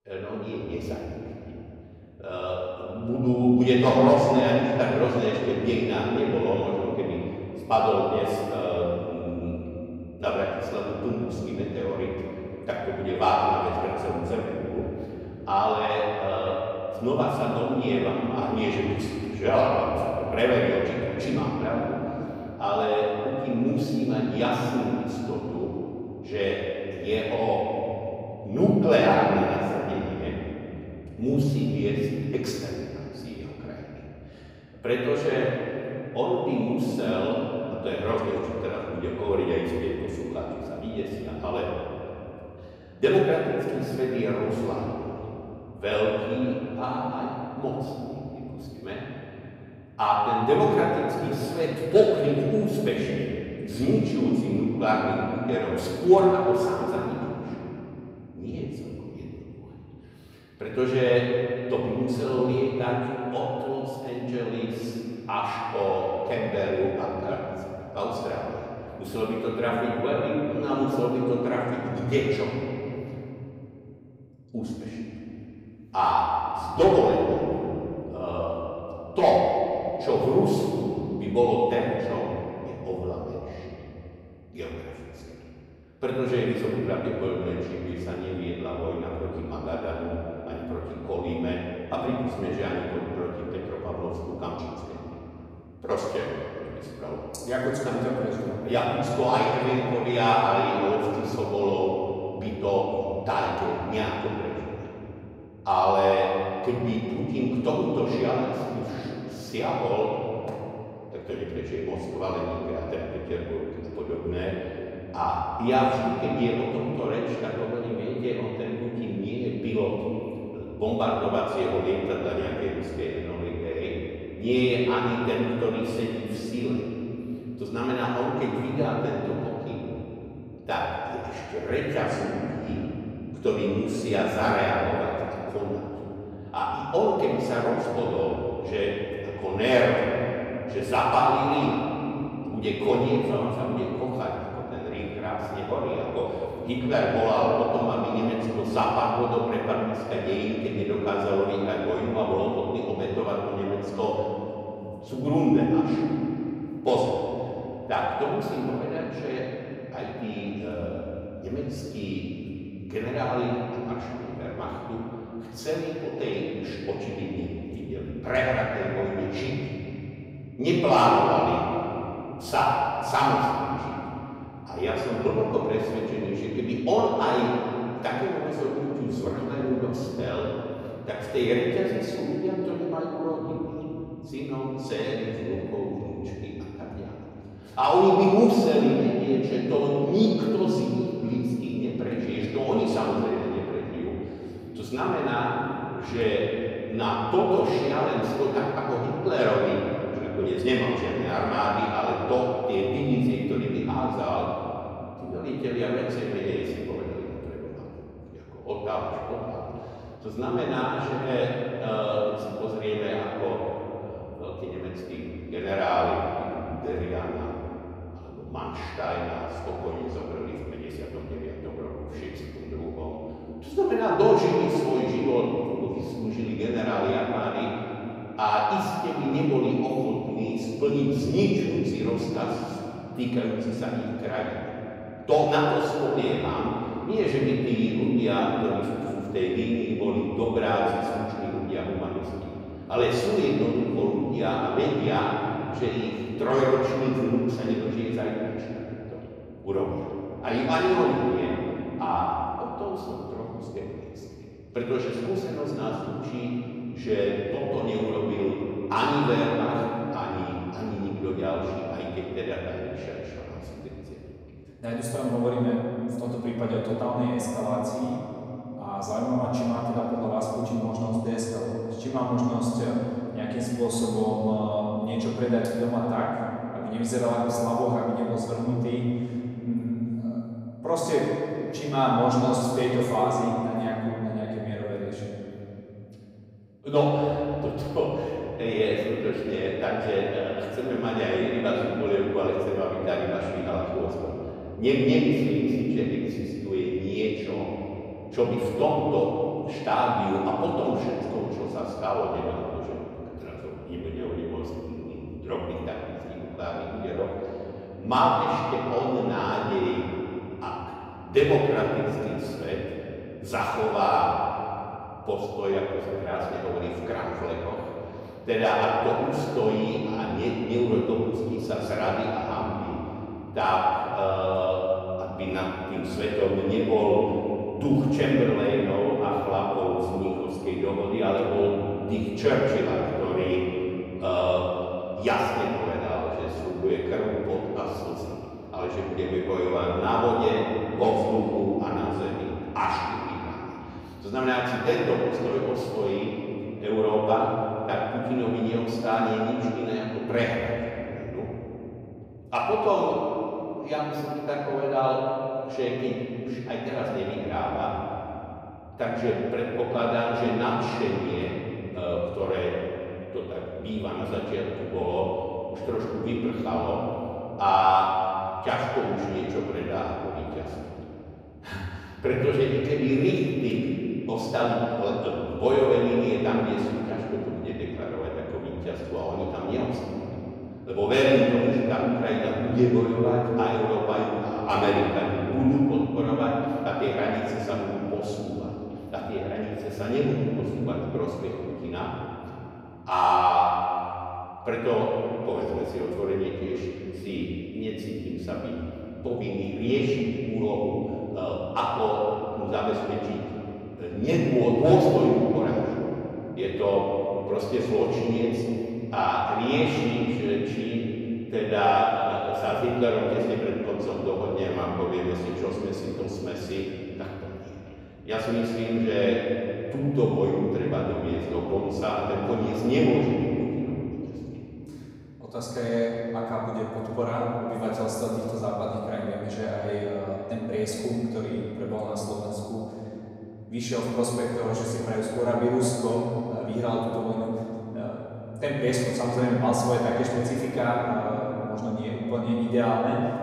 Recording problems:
room echo; strong; dies away in 3 s
off-mic speech; far

